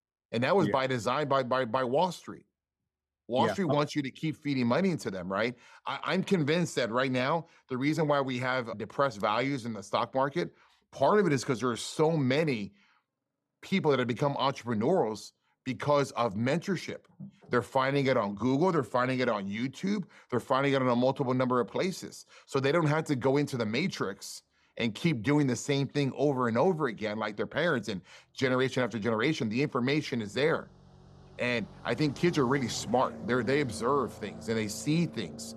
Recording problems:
traffic noise; noticeable; throughout; 15 dB below the speech

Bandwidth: 13.5 kHz